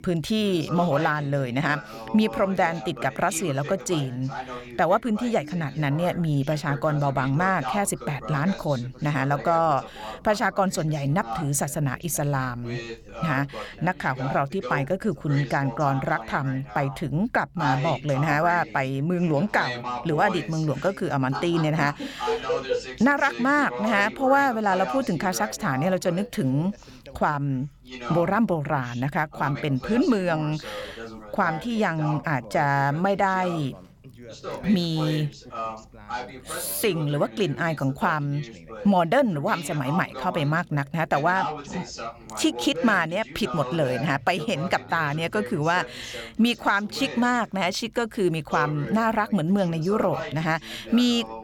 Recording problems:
background chatter; noticeable; throughout; 2 voices, 10 dB below the speech

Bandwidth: 17 kHz